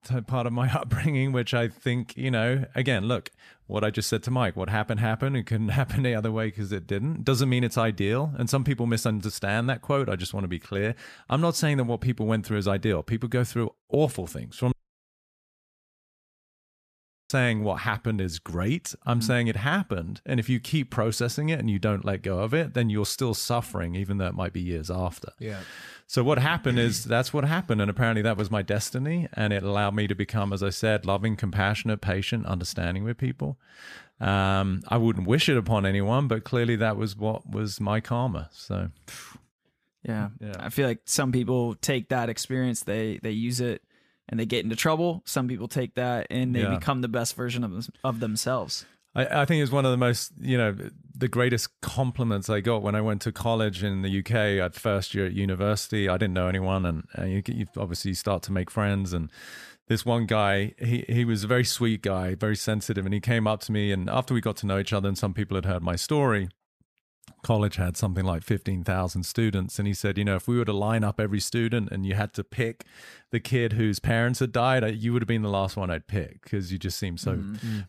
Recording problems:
audio cutting out; at 15 s for 2.5 s

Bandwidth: 14.5 kHz